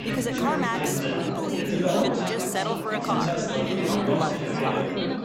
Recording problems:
chatter from many people; very loud; throughout; 4 dB above the speech
rain or running water; faint; throughout; 30 dB below the speech

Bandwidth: 16 kHz